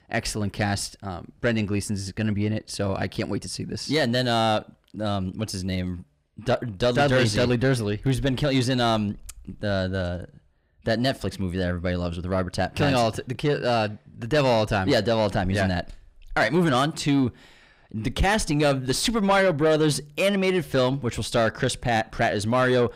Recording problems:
distortion; slight; 10 dB below the speech

